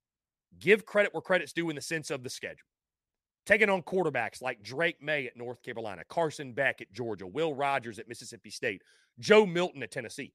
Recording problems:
none

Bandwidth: 14.5 kHz